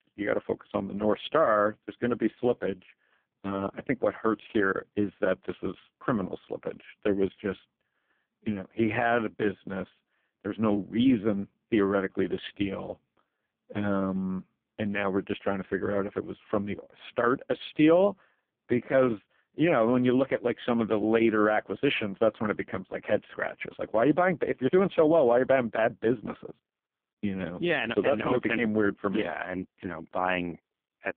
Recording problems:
phone-call audio; poor line

